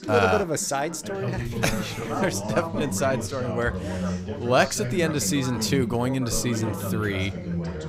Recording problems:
background chatter; loud; throughout; 3 voices, 5 dB below the speech

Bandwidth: 15.5 kHz